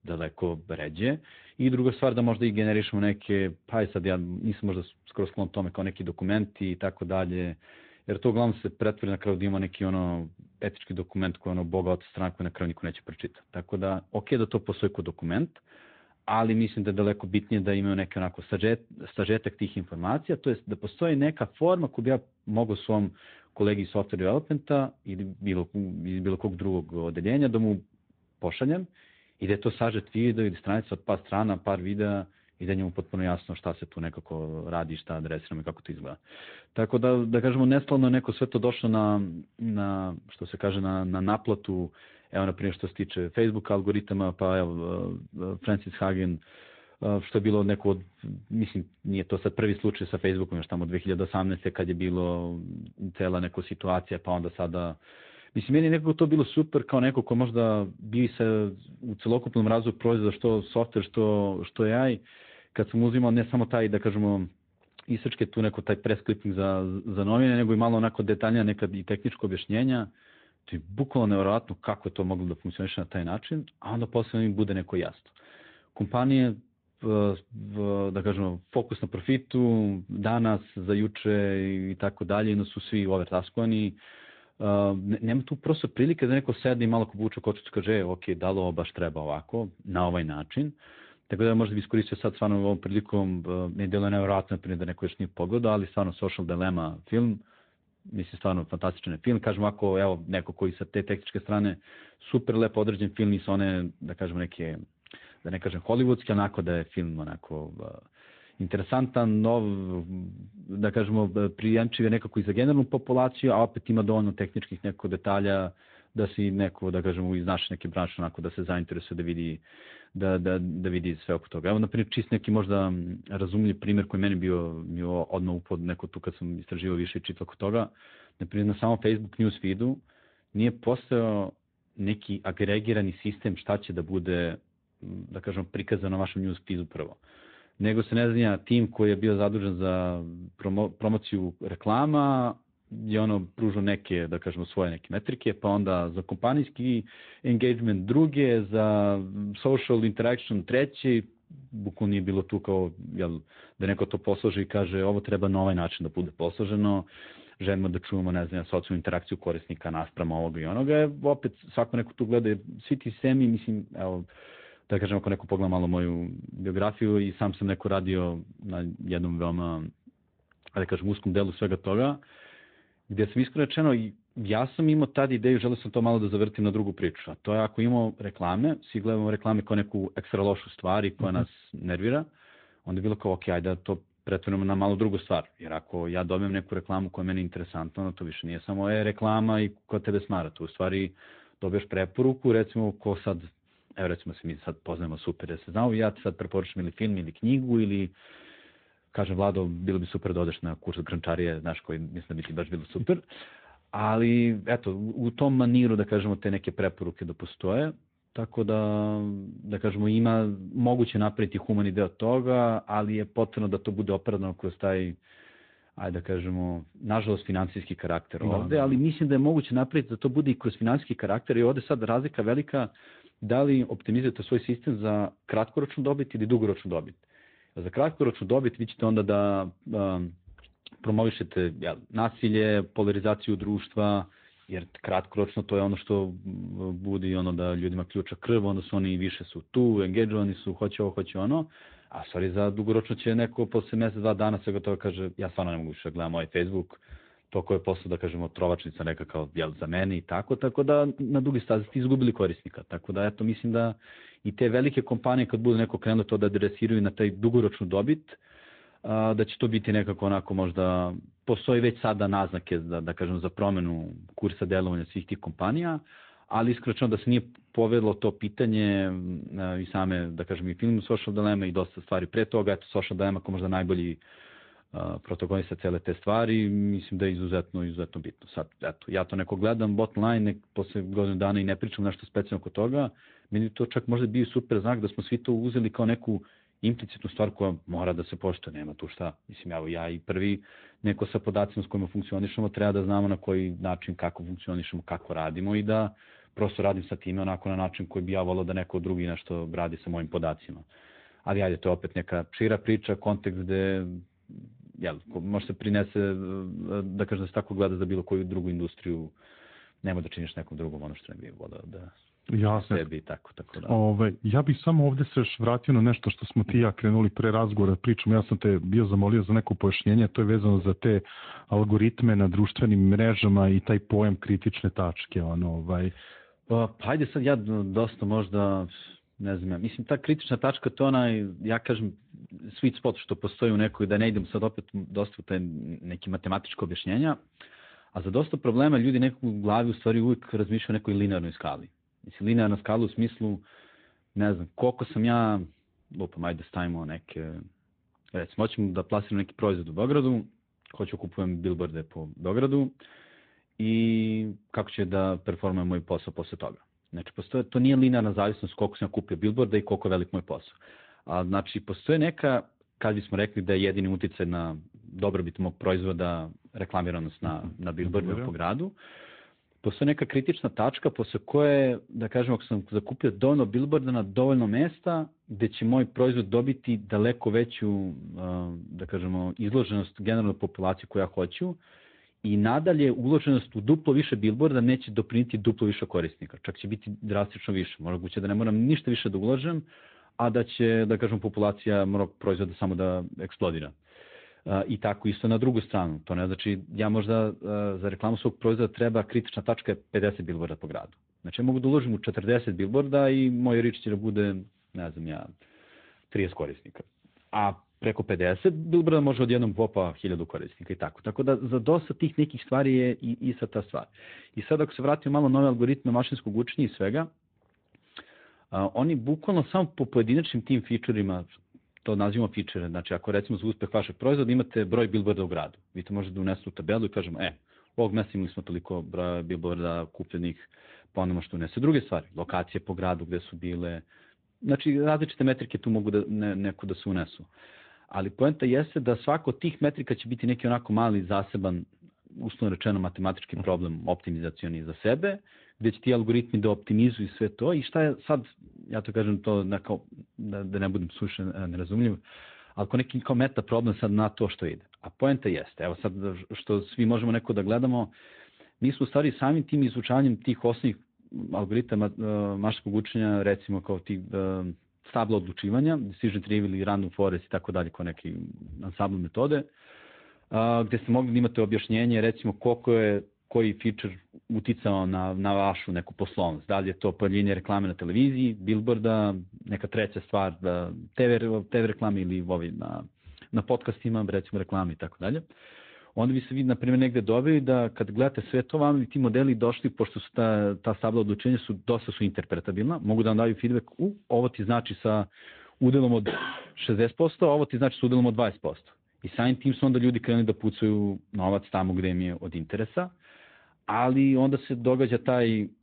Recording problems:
high frequencies cut off; severe; nothing above 4 kHz
garbled, watery; slightly

